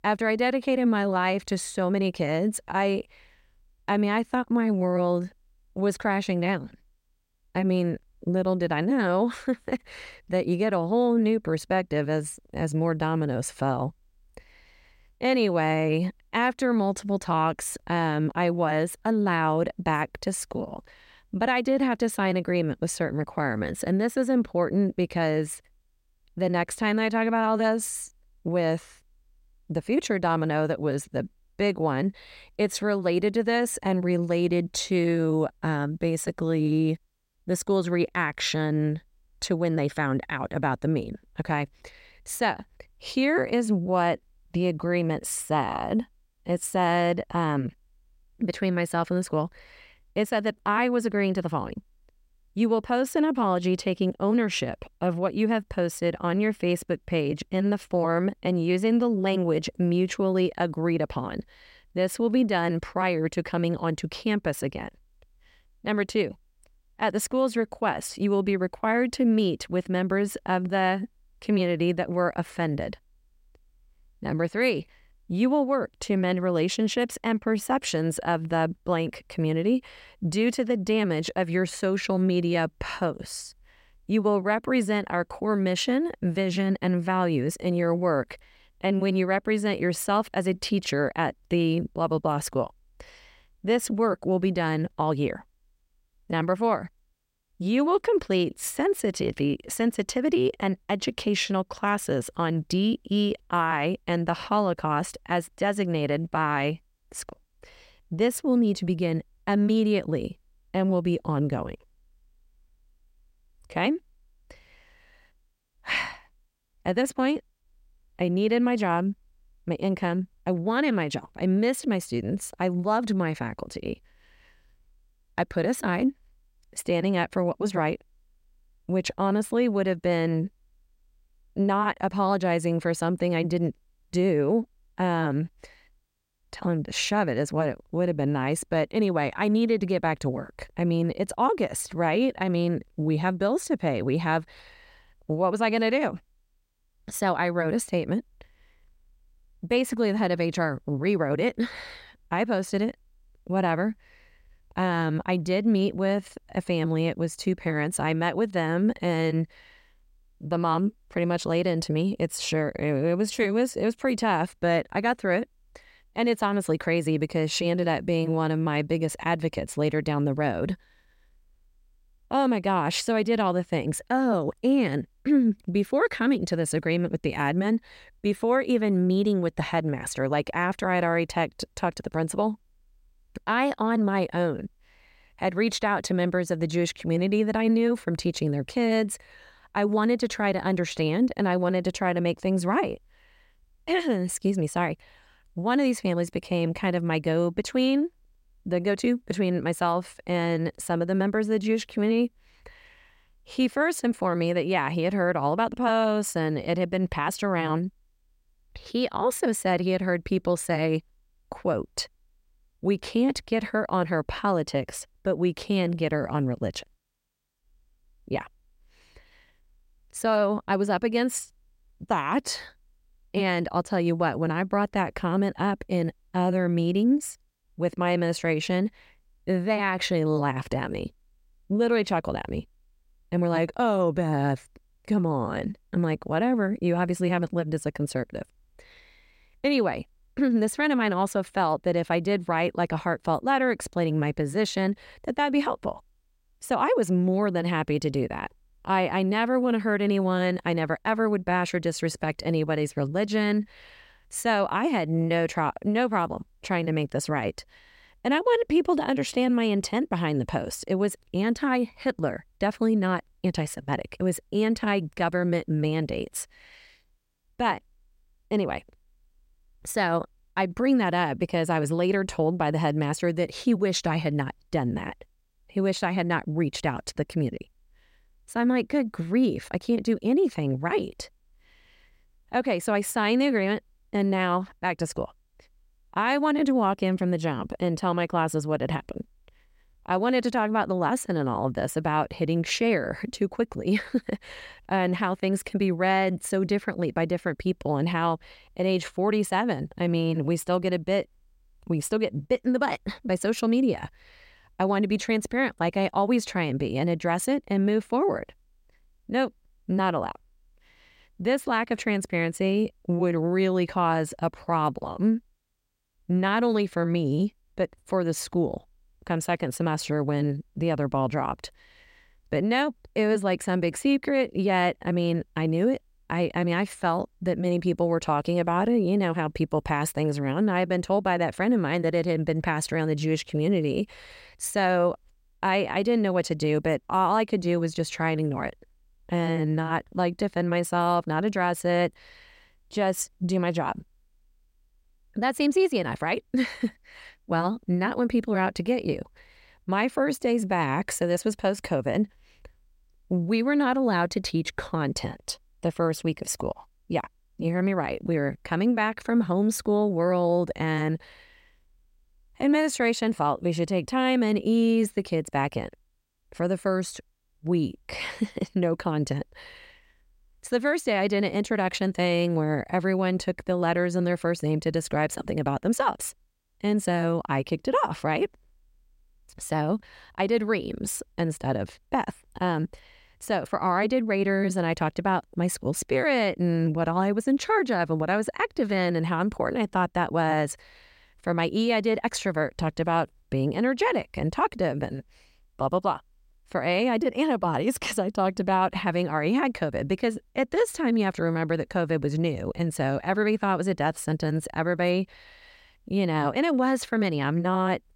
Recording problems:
none

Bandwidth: 16 kHz